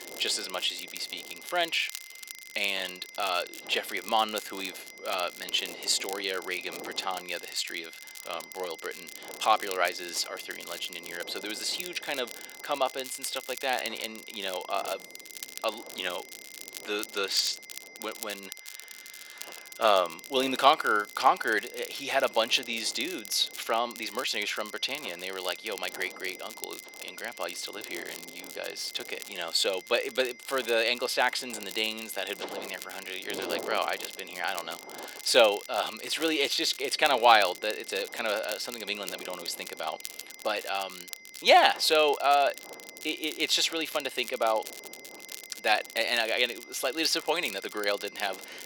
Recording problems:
thin; very; fading below 450 Hz
high-pitched whine; noticeable; throughout; 2 kHz, 20 dB below the speech
wind noise on the microphone; occasional gusts; 20 dB below the speech
crackle, like an old record; noticeable; 15 dB below the speech

